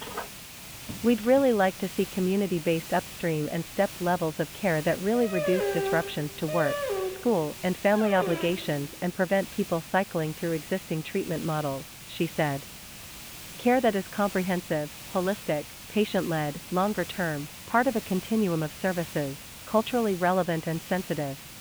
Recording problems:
high frequencies cut off; severe; nothing above 4 kHz
hiss; noticeable; throughout; 10 dB below the speech
phone ringing; faint; until 1.5 s; peak 10 dB below the speech
dog barking; noticeable; from 5 to 8.5 s; peak level with the speech

